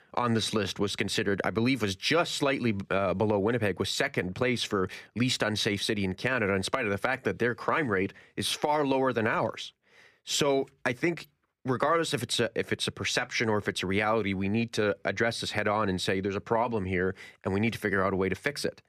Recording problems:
none

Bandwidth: 15 kHz